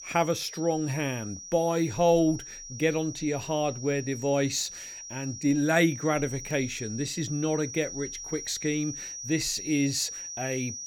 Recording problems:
high-pitched whine; loud; throughout; 5.5 kHz, 10 dB below the speech

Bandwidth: 17 kHz